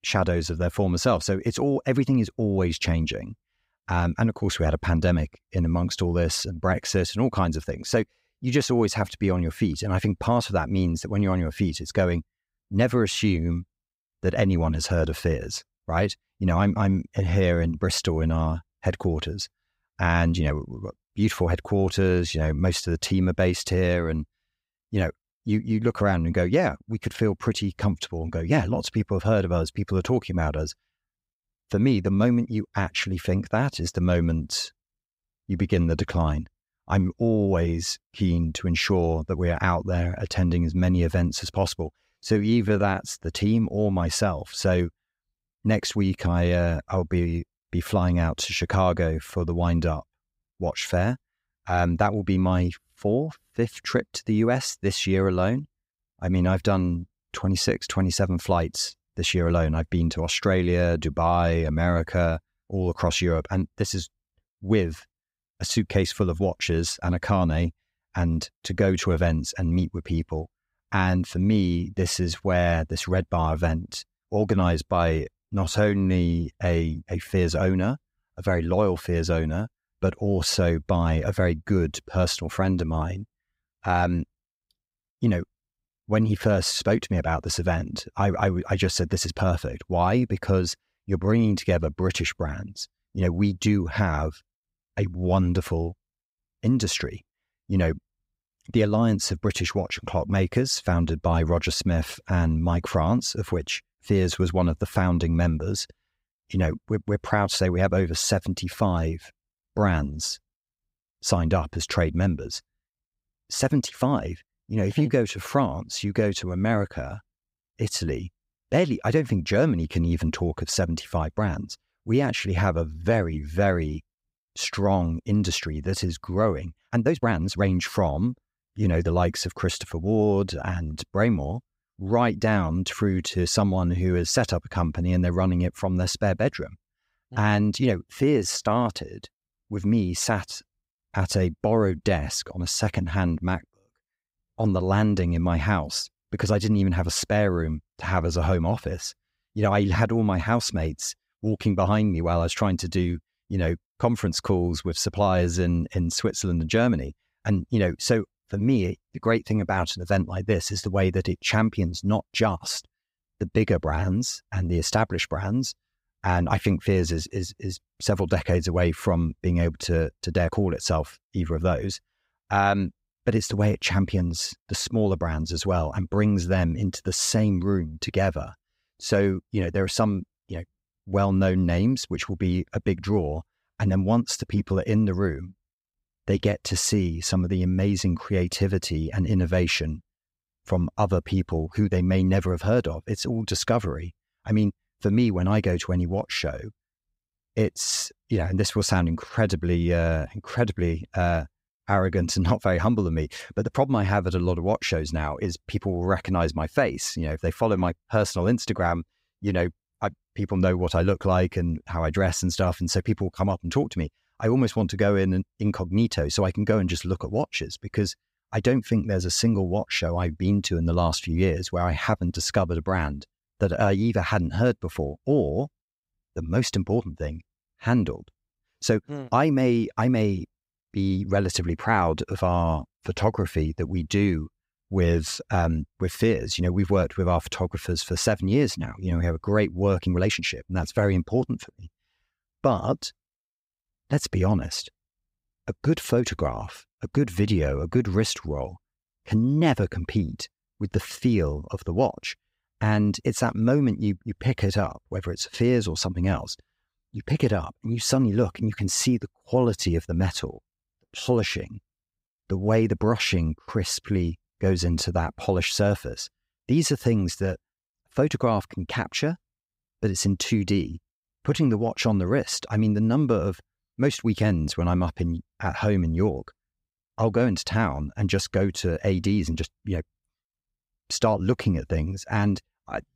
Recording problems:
uneven, jittery; strongly; from 20 s to 4:29

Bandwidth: 15.5 kHz